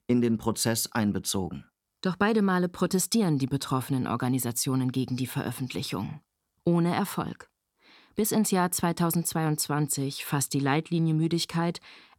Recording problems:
none

